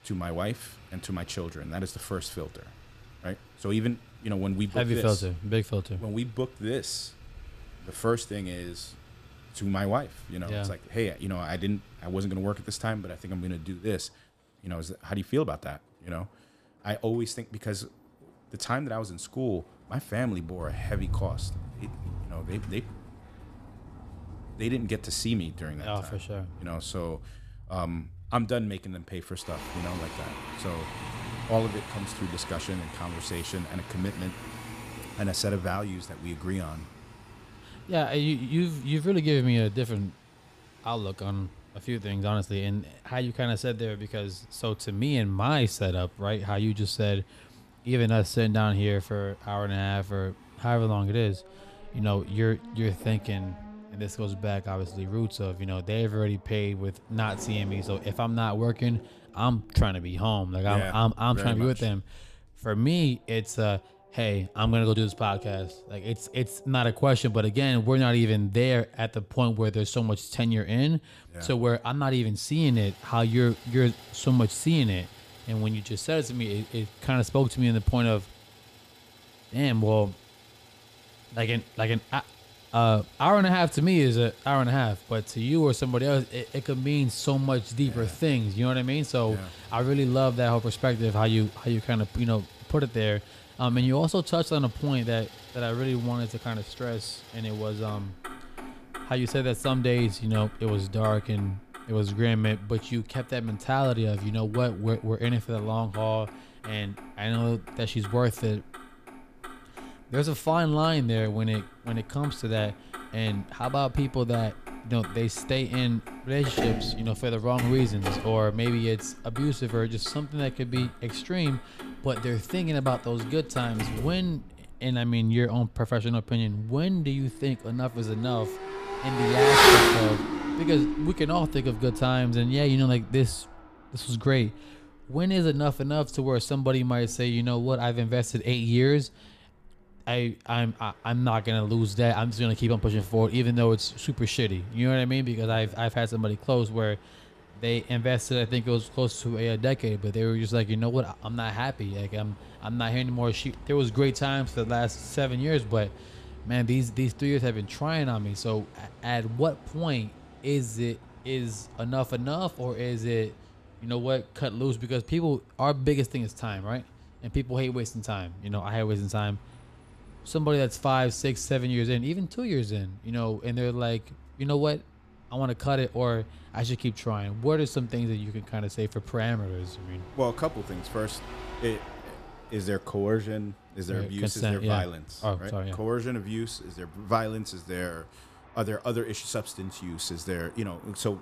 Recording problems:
traffic noise; loud; throughout; 6 dB below the speech

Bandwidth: 14.5 kHz